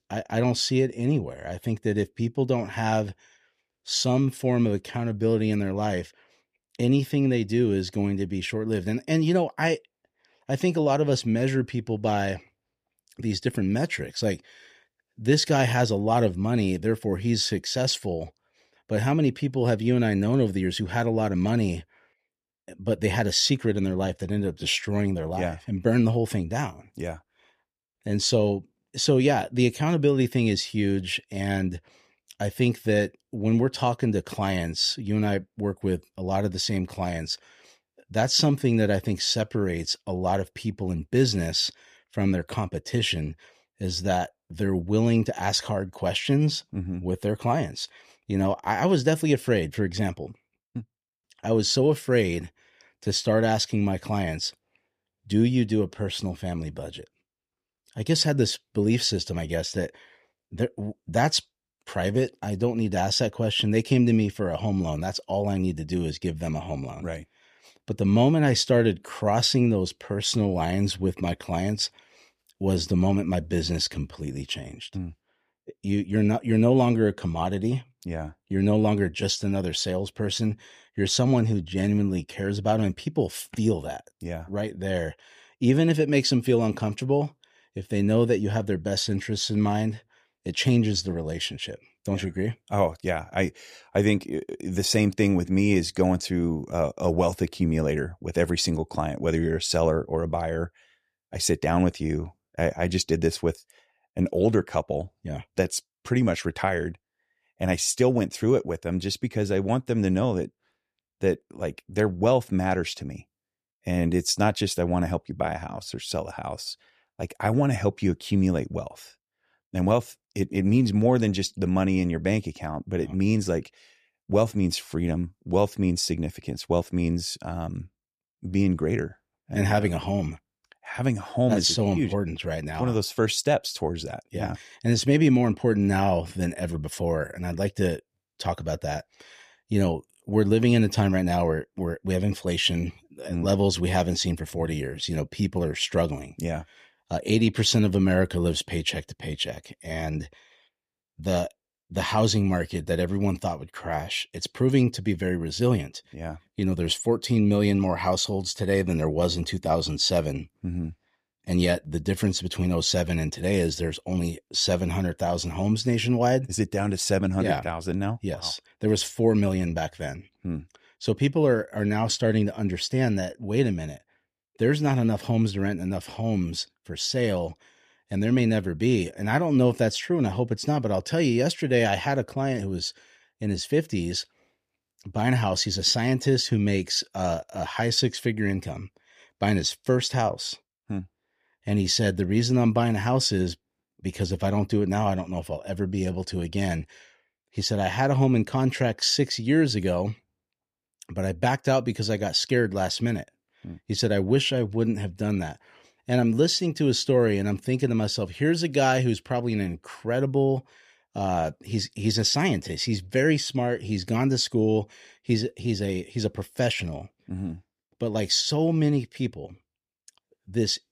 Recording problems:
none

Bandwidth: 14.5 kHz